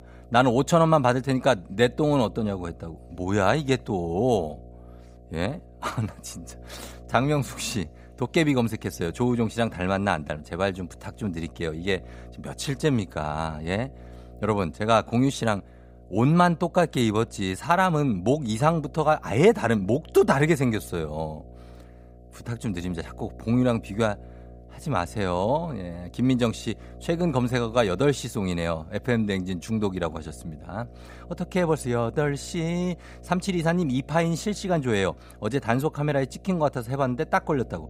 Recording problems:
electrical hum; faint; throughout; 60 Hz, 25 dB below the speech

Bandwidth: 15.5 kHz